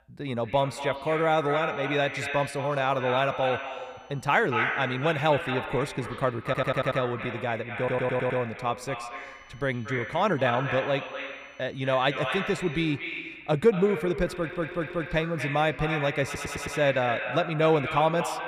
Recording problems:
echo of what is said; strong; throughout; 230 ms later, 6 dB below the speech
high-pitched whine; faint; from 1.5 to 5 s and from 9 to 13 s; 3 kHz, 30 dB below the speech
audio stuttering; 4 times, first at 6.5 s

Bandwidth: 15 kHz